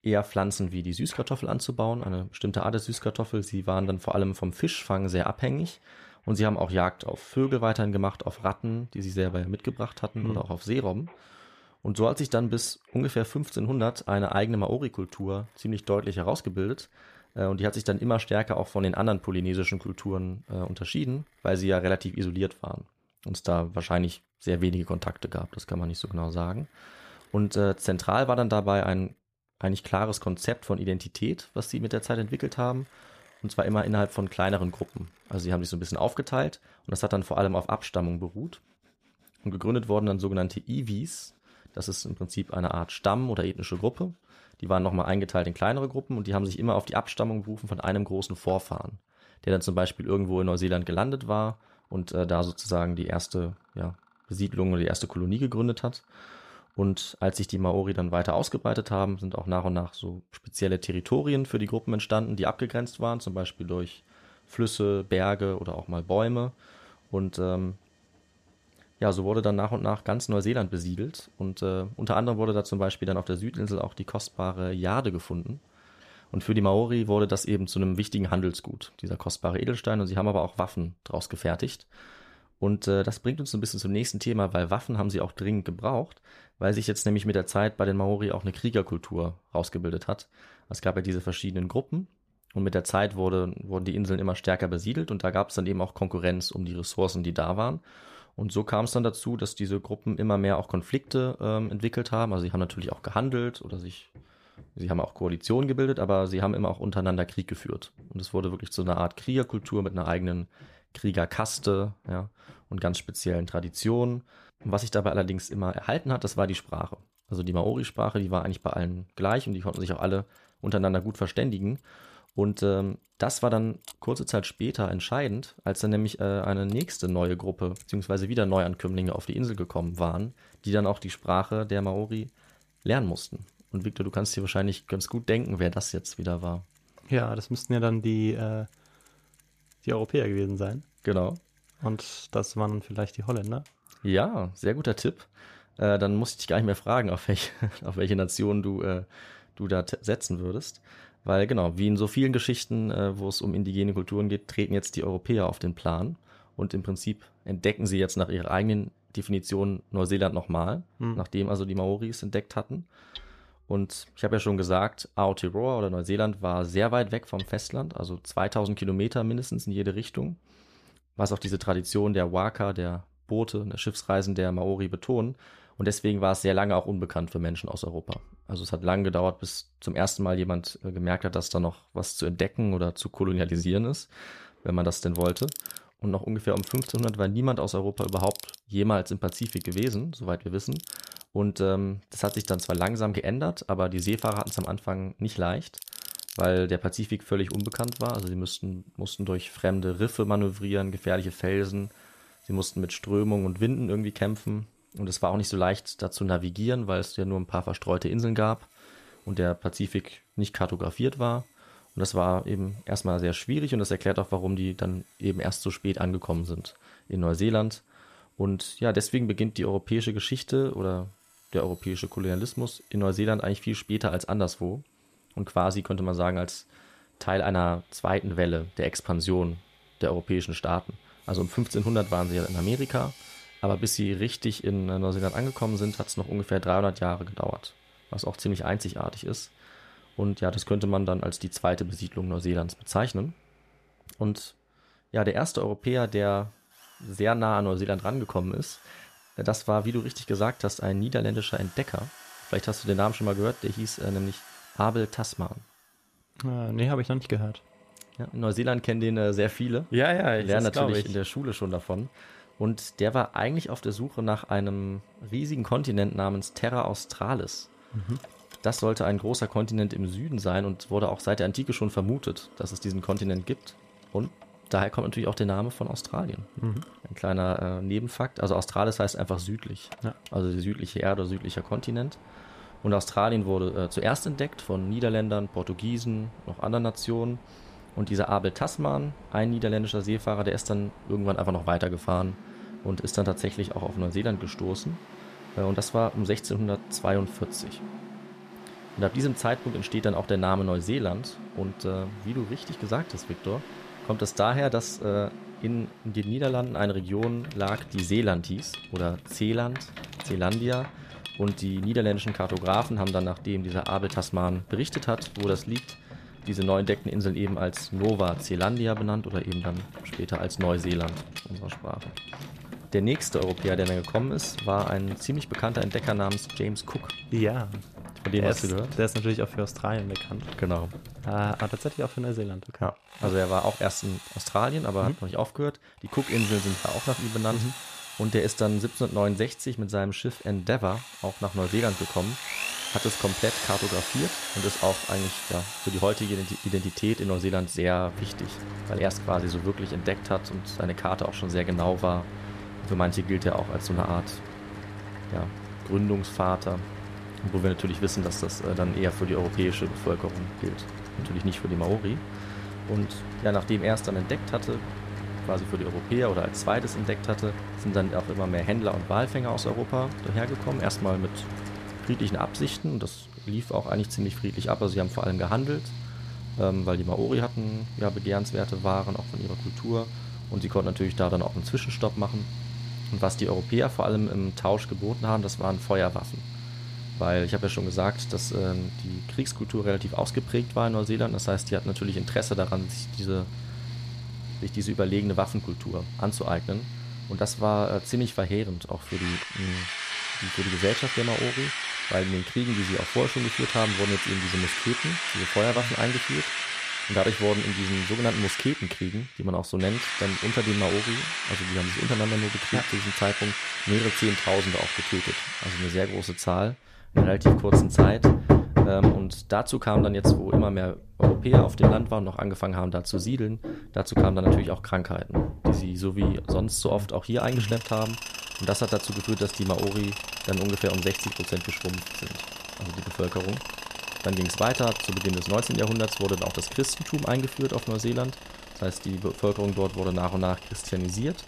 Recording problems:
machinery noise; loud; throughout; 4 dB below the speech

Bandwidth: 14.5 kHz